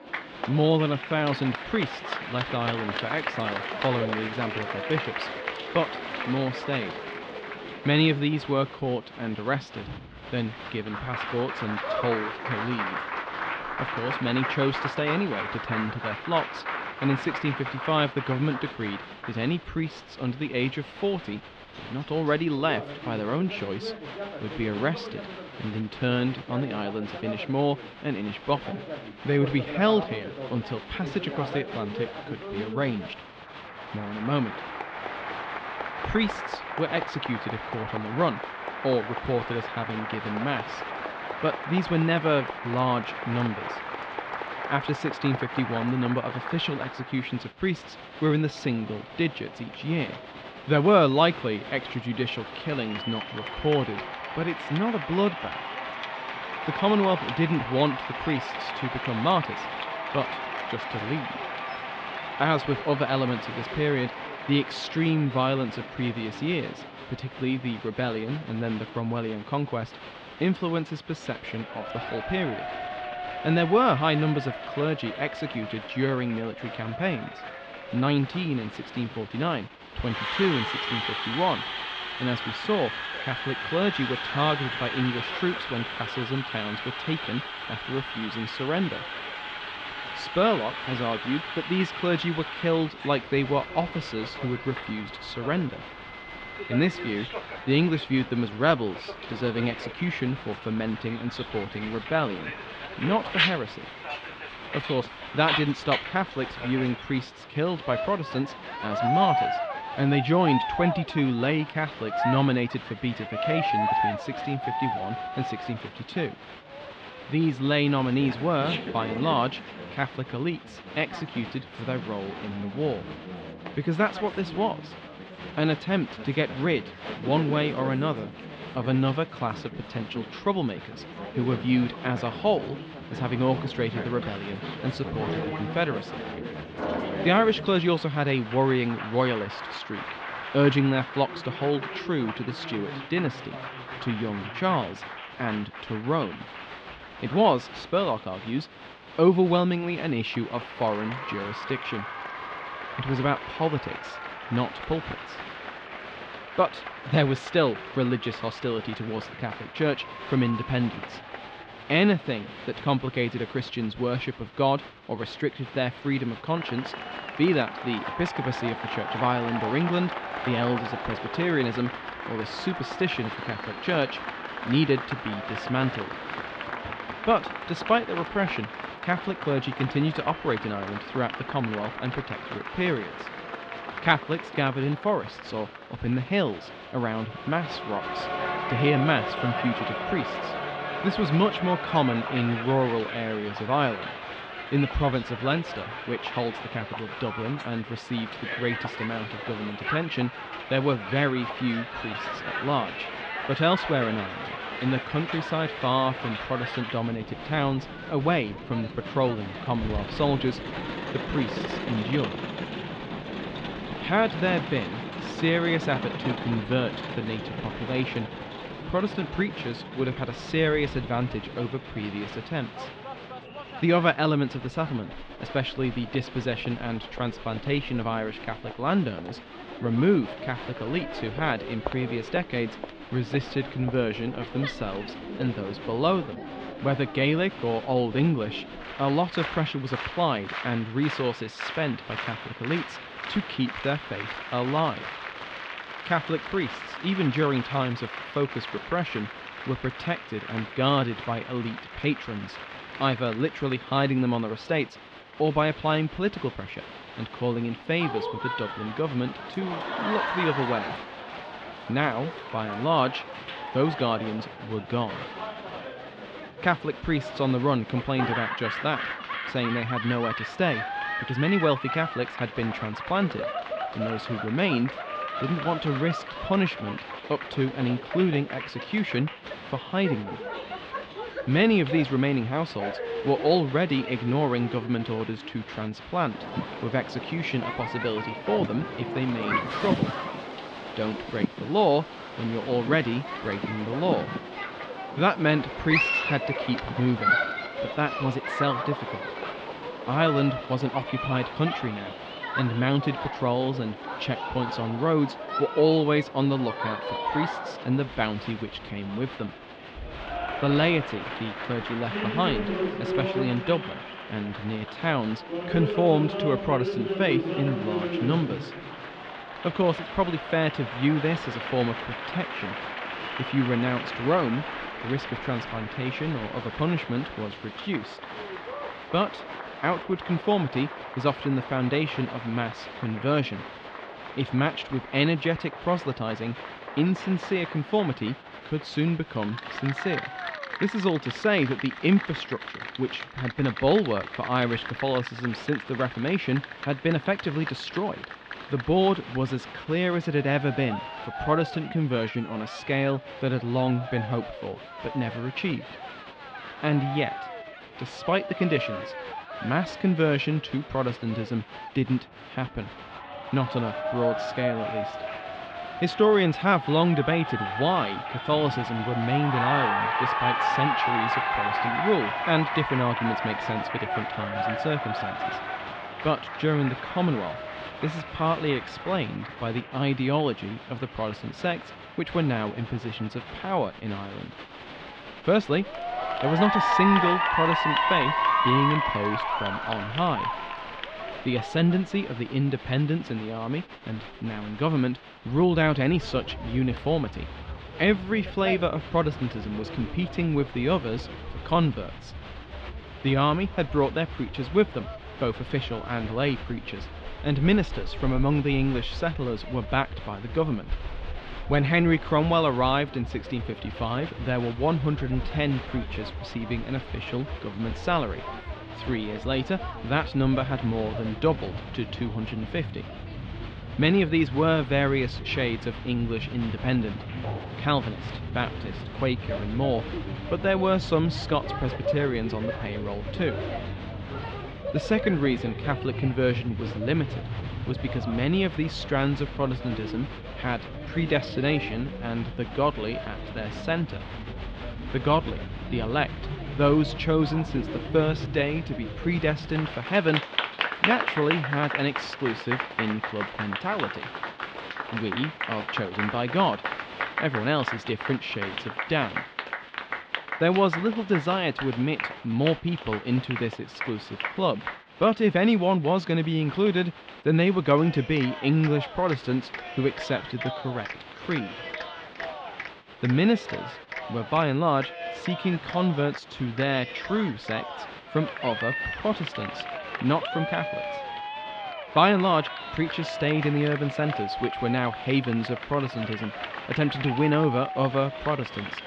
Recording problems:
muffled; slightly; fading above 3.5 kHz
crowd noise; loud; throughout; 6 dB below the speech

